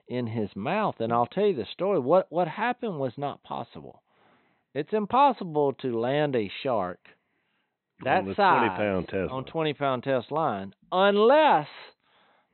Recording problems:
high frequencies cut off; severe; nothing above 4 kHz

